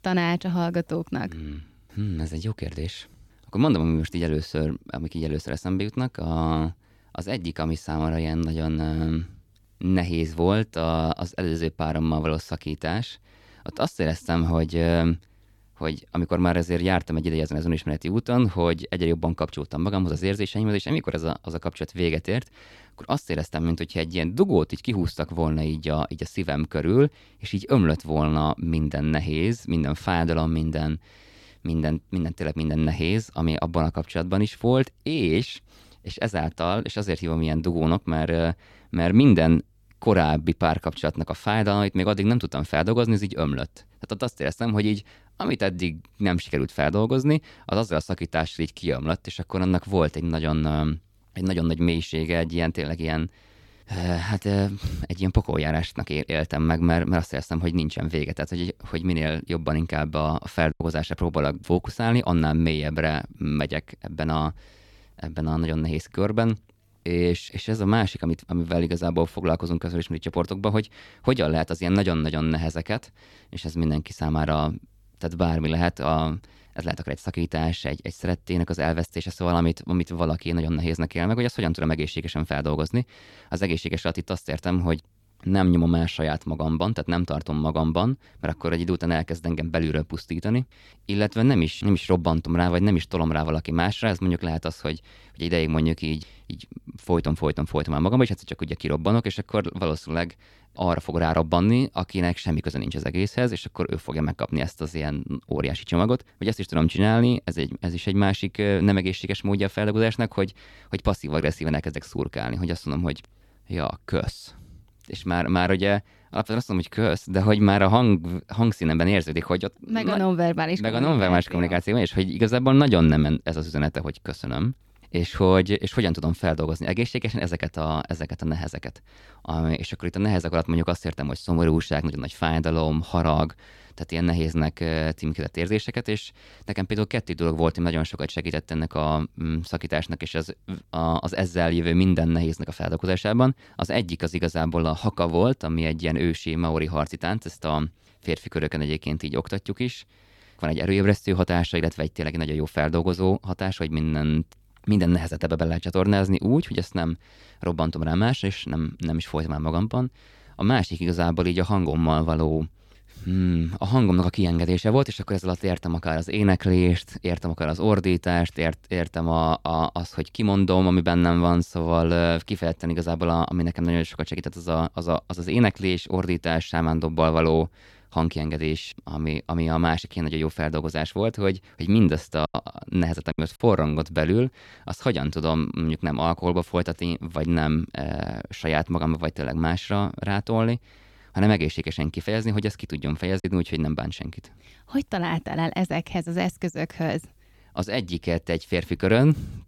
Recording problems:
choppy; occasionally; at 1:01, from 3:02 to 3:04 and at 3:13; 4% of the speech affected

